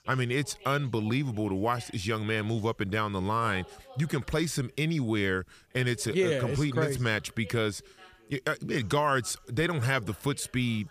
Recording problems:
background chatter; faint; throughout; 2 voices, 25 dB below the speech

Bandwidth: 15 kHz